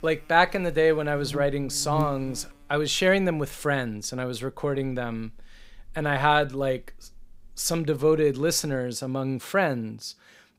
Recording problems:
electrical hum; very faint; until 9 s; 60 Hz, 20 dB below the speech

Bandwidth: 15.5 kHz